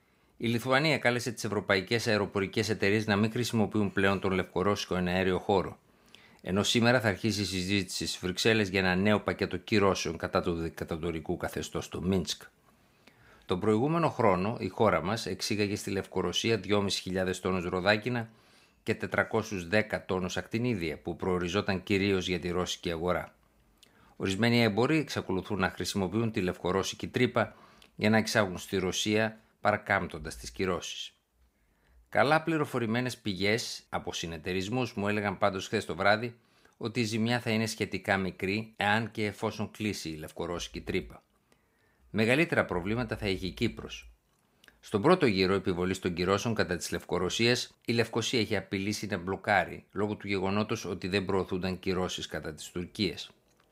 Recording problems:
none

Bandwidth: 15.5 kHz